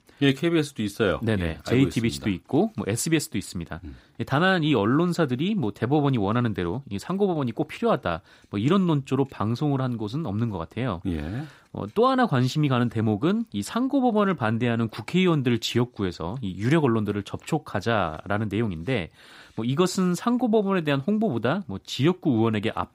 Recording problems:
none

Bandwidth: 15.5 kHz